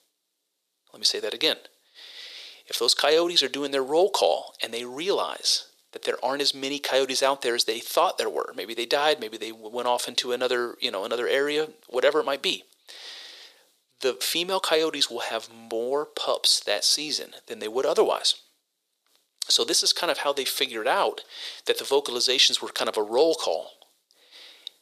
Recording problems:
thin; very; fading below 450 Hz

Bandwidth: 14.5 kHz